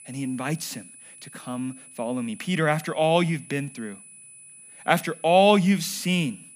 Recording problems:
high-pitched whine; faint; throughout; 10 kHz, 20 dB below the speech

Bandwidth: 15 kHz